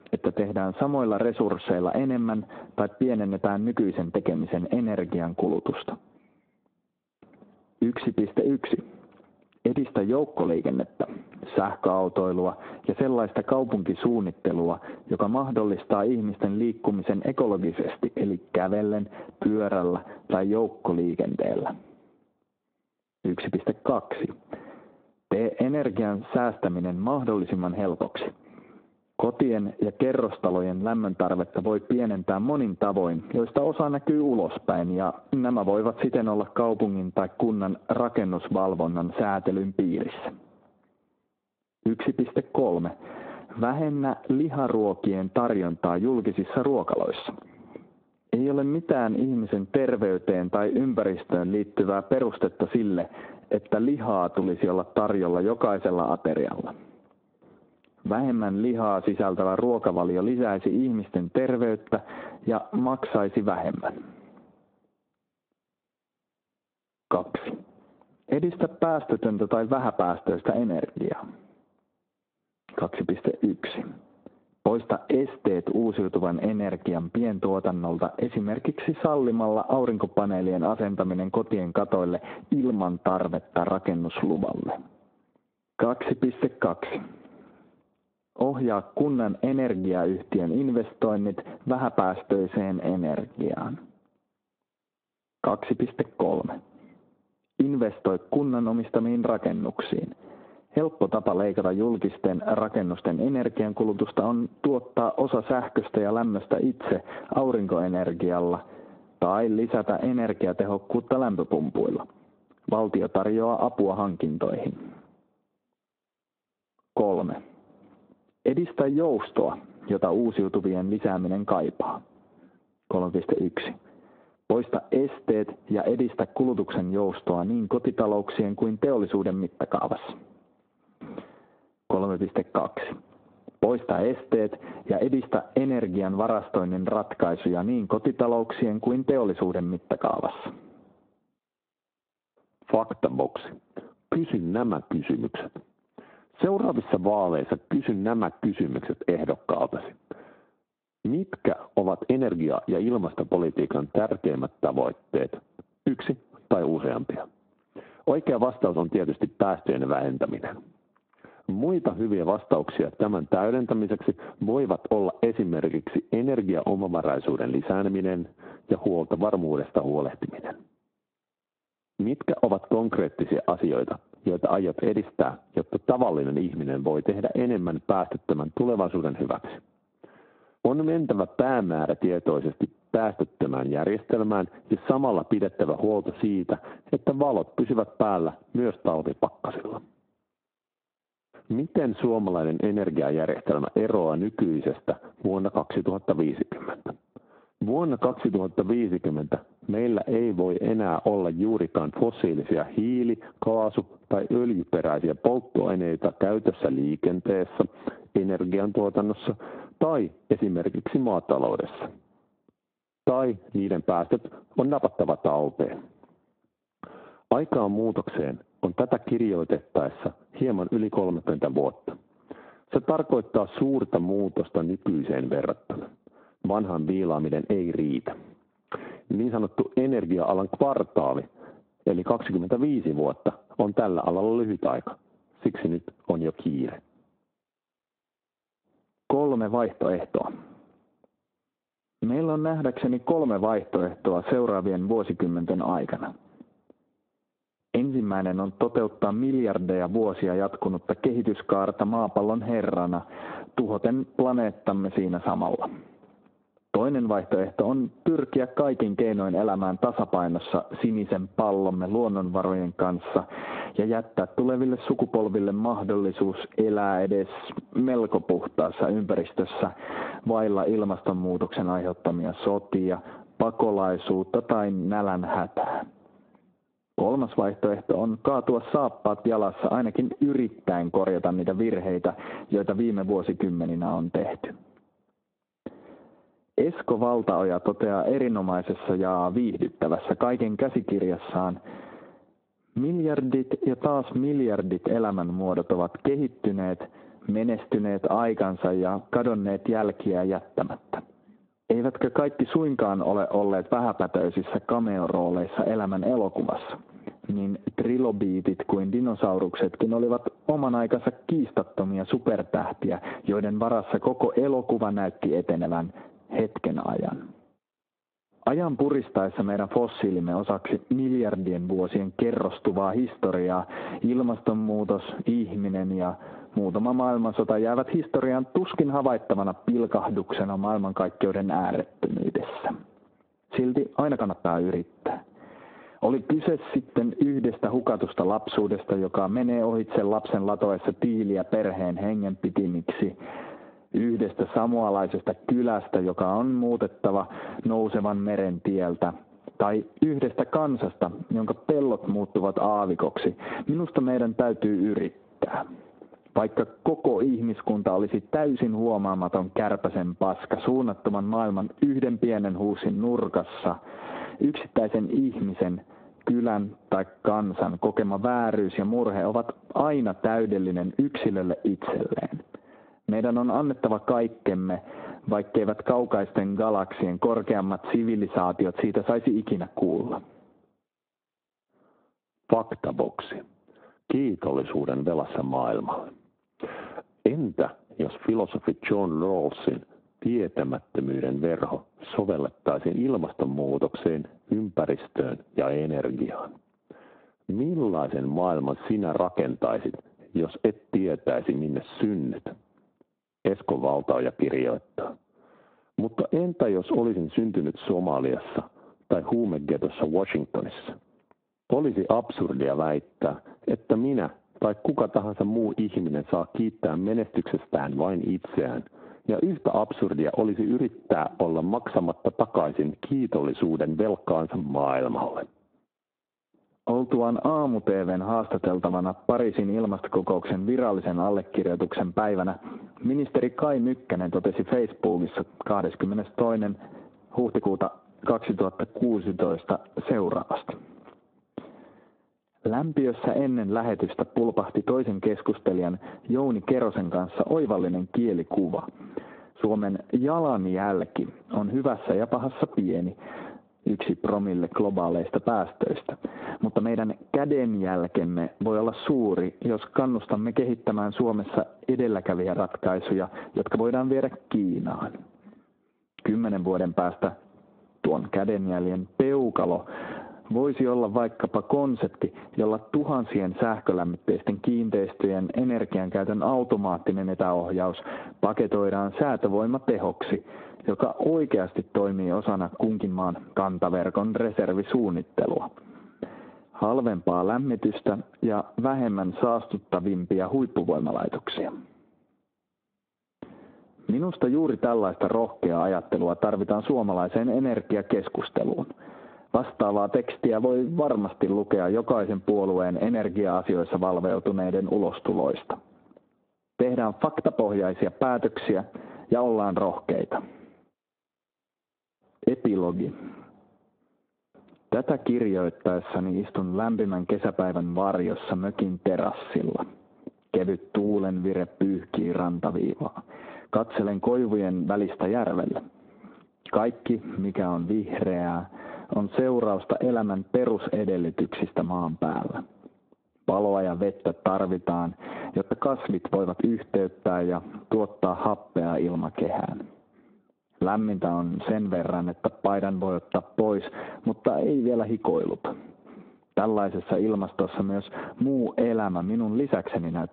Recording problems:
squashed, flat; heavily
phone-call audio; nothing above 4 kHz
muffled; very slightly; fading above 1 kHz
uneven, jittery; strongly; from 19 s to 8:57

